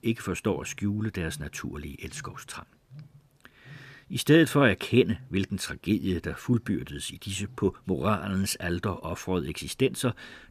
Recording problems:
animal sounds; faint; throughout; 25 dB below the speech

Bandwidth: 14.5 kHz